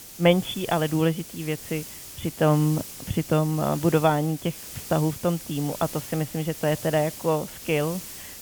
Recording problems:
high frequencies cut off; severe; nothing above 3.5 kHz
hiss; noticeable; throughout; 10 dB below the speech

